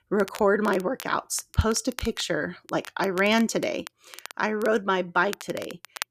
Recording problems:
crackle, like an old record; noticeable; 15 dB below the speech

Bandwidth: 14.5 kHz